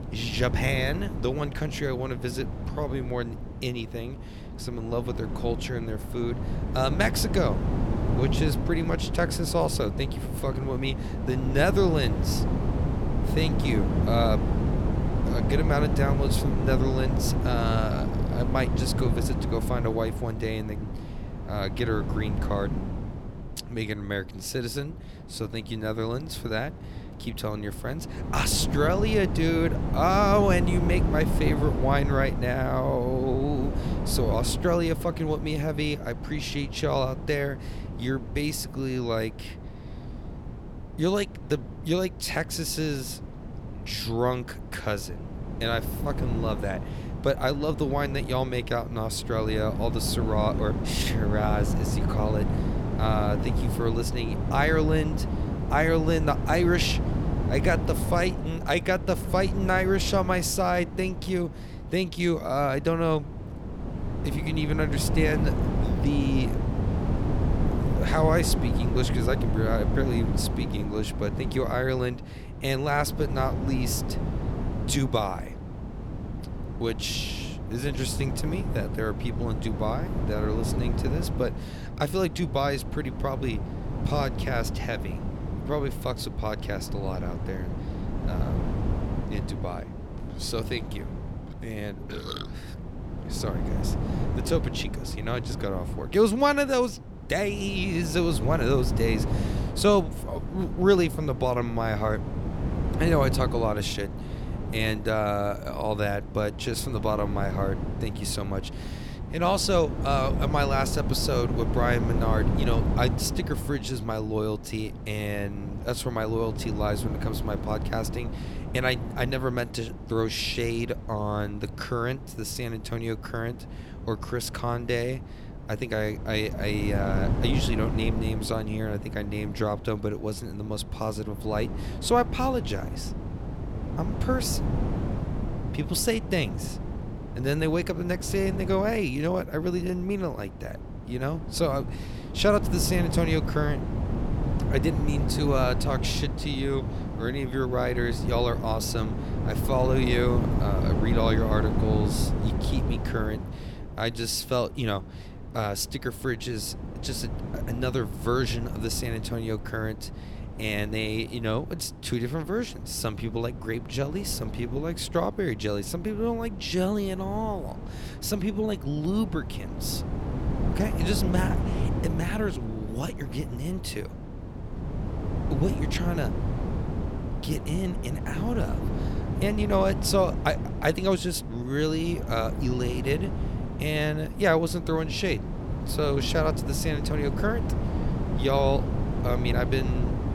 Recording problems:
wind noise on the microphone; heavy; 9 dB below the speech

